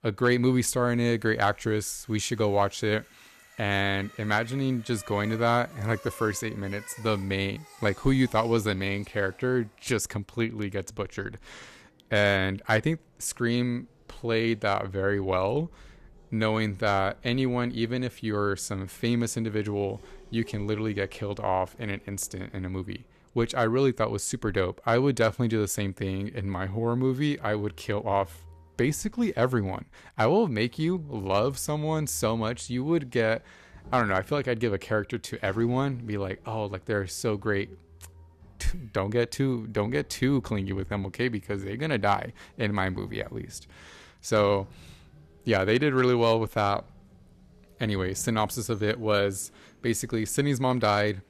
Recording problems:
traffic noise; faint; throughout; 25 dB below the speech

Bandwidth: 14 kHz